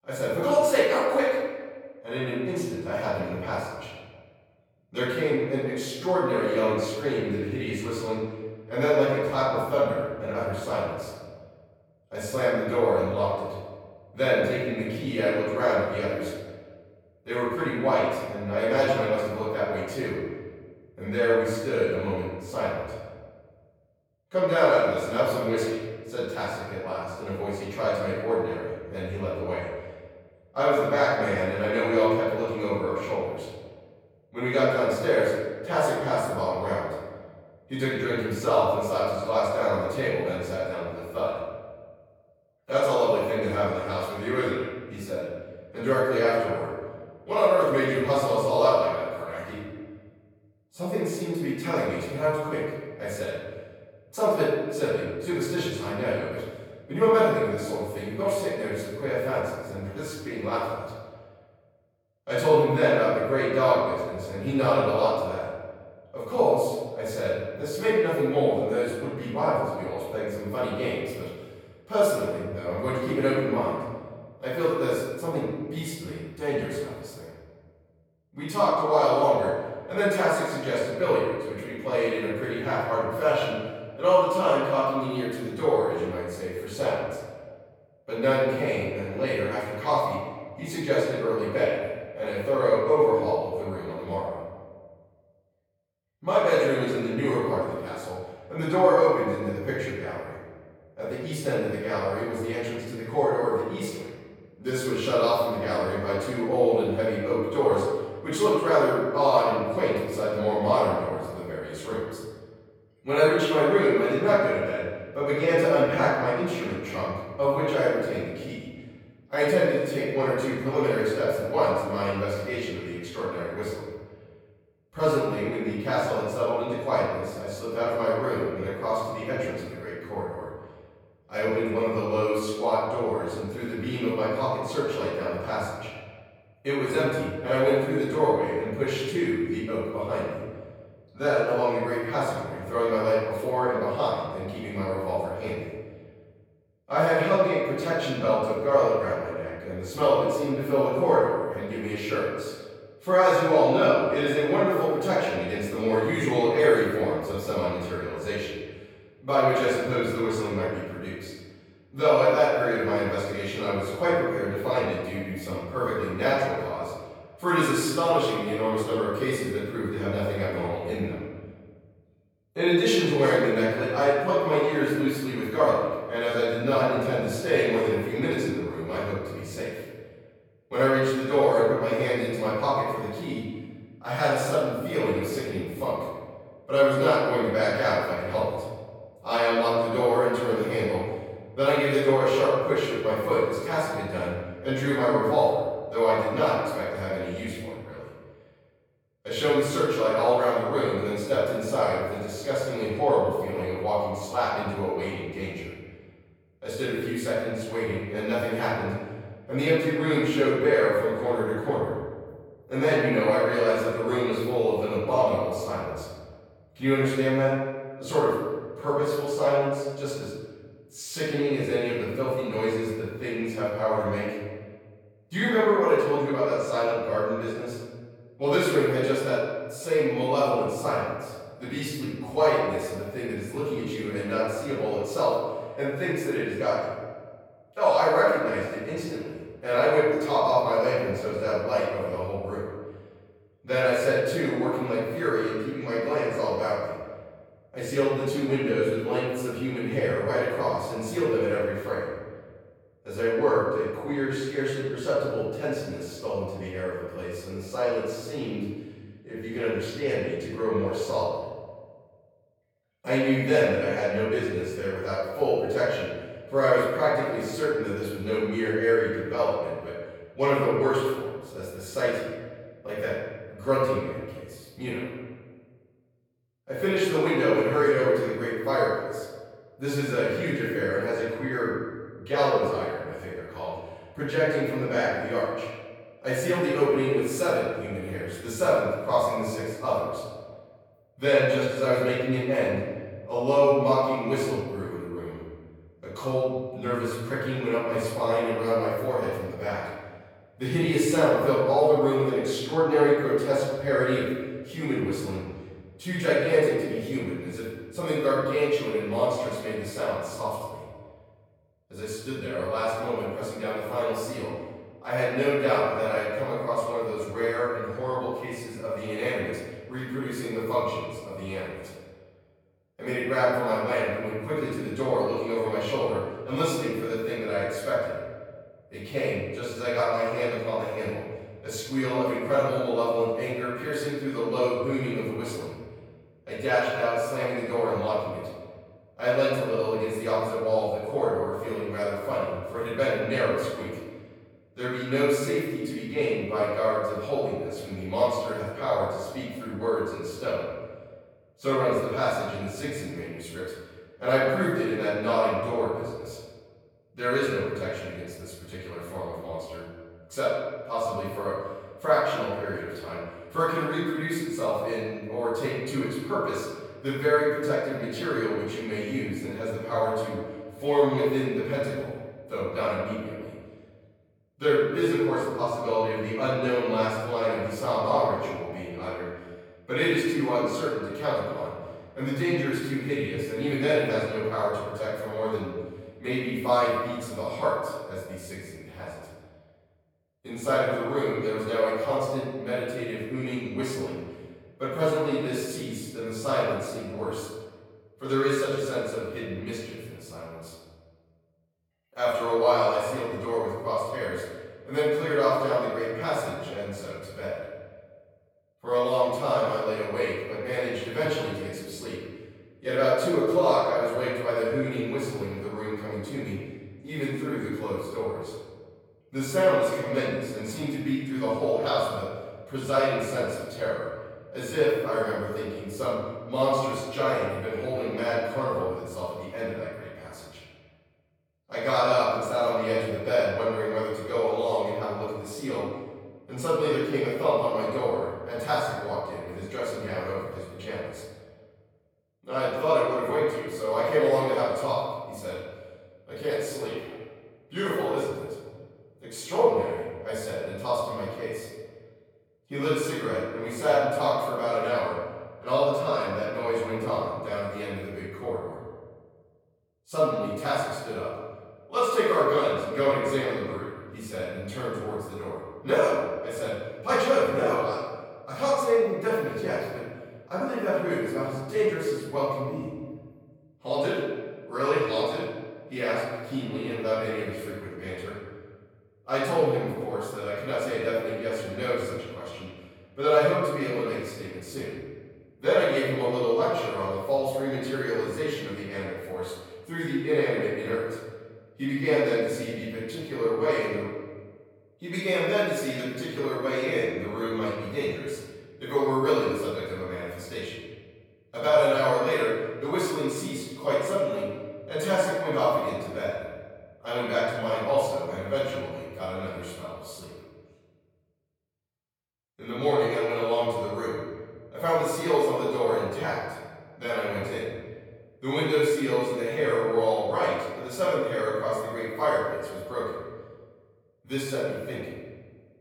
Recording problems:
room echo; strong; dies away in 1.4 s
off-mic speech; far

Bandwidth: 18.5 kHz